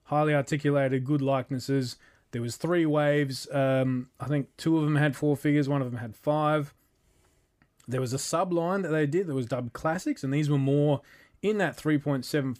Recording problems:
none

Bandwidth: 15 kHz